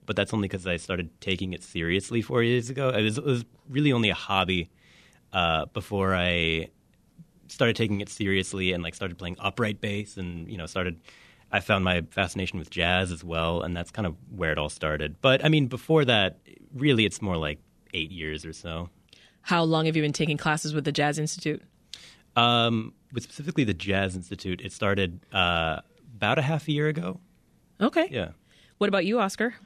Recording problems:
none

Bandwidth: 14.5 kHz